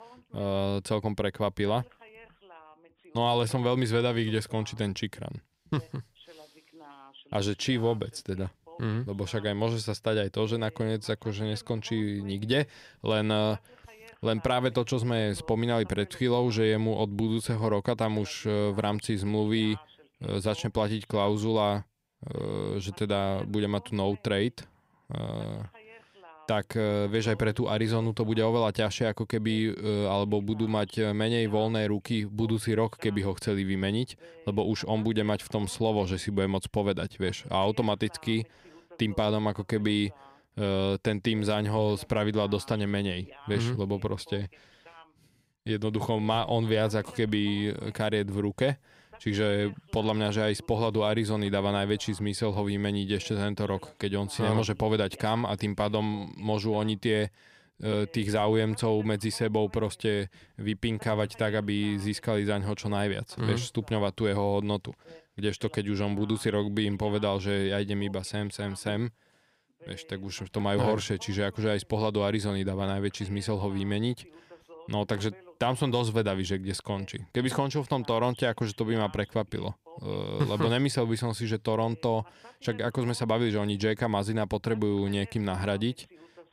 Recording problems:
voice in the background; faint; throughout; 25 dB below the speech

